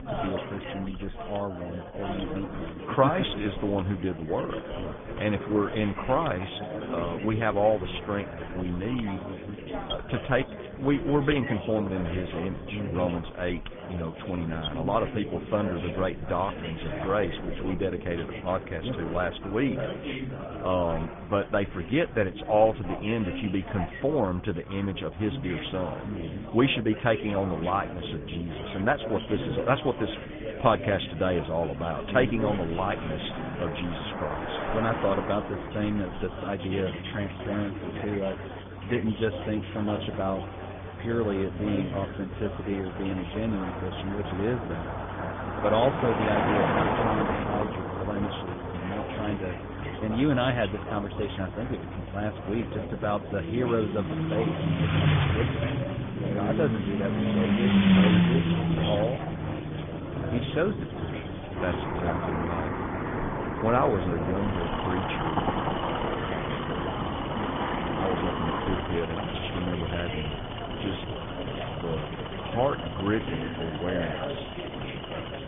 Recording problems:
high frequencies cut off; severe; nothing above 3.5 kHz
garbled, watery; slightly
traffic noise; loud; throughout; as loud as the speech
chatter from many people; loud; throughout; 6 dB below the speech
machinery noise; noticeable; throughout; 10 dB below the speech

